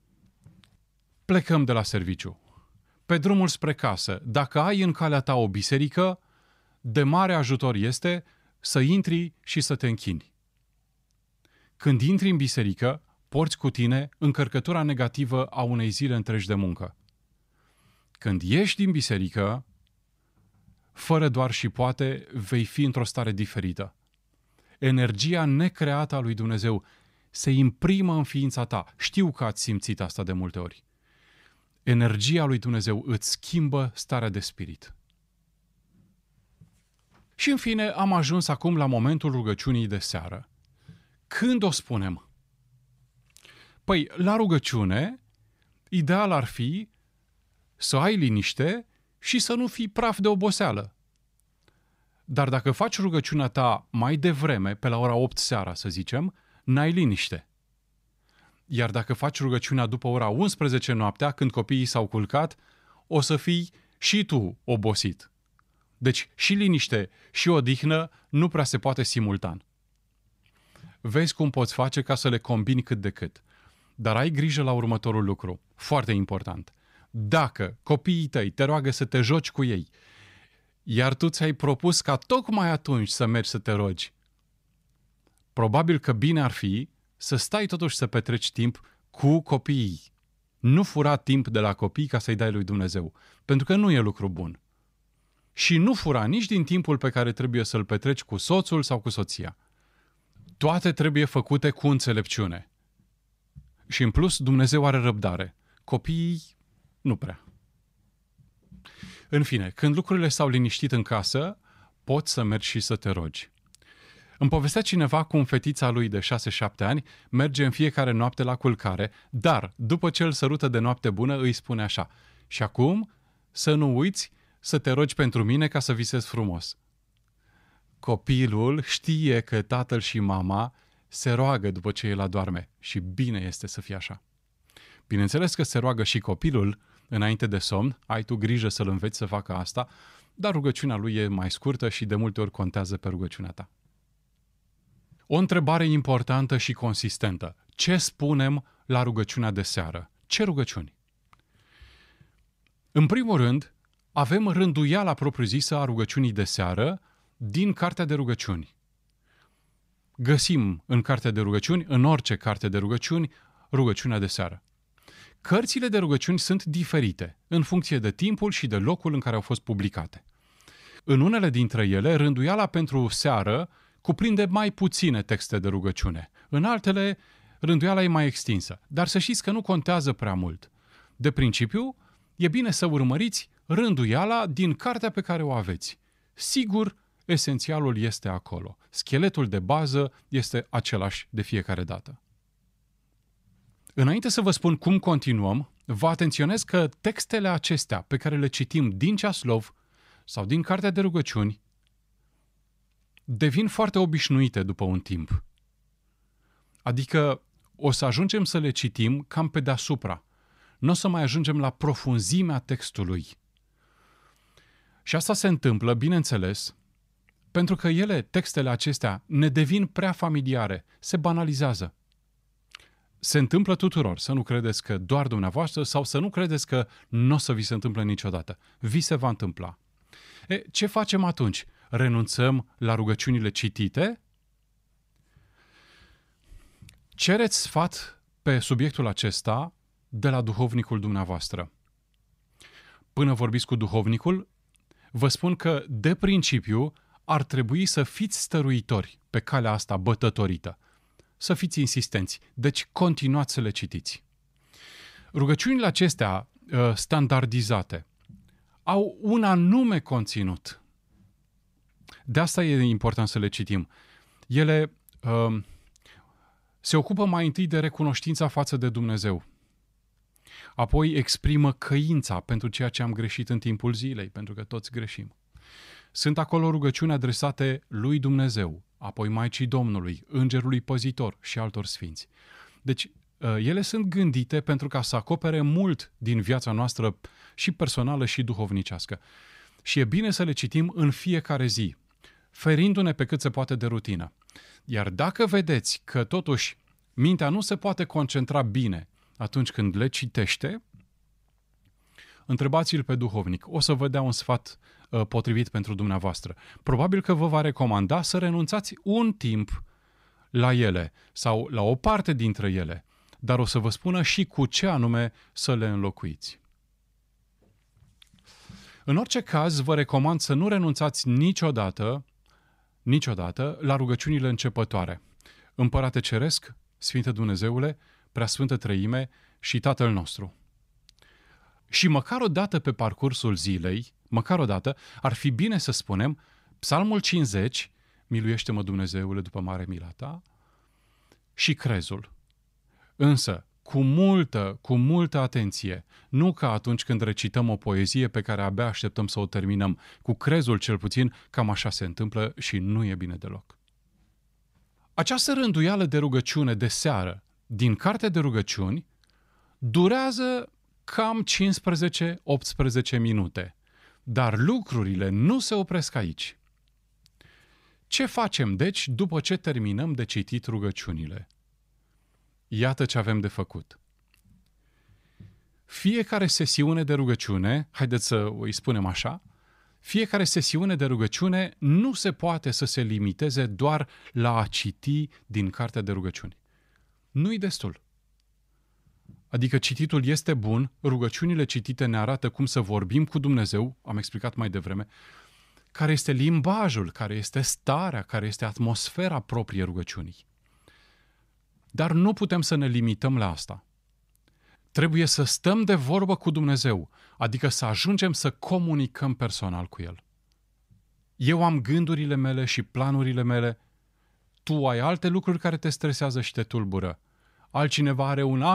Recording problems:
abrupt cut into speech; at the end

